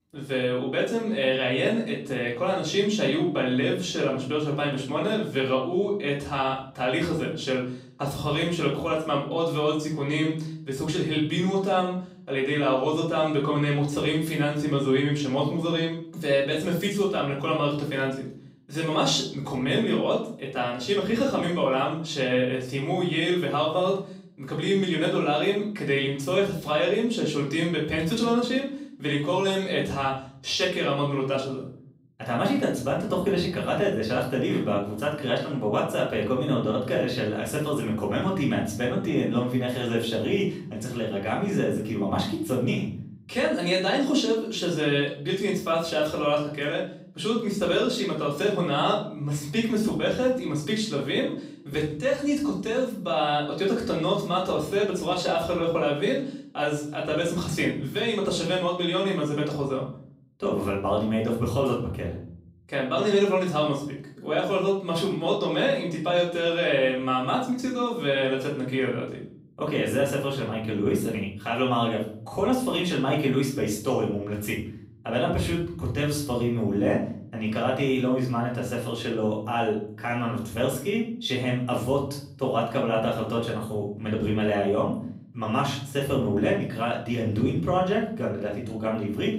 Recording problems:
off-mic speech; far
room echo; noticeable; dies away in 0.6 s

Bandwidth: 15.5 kHz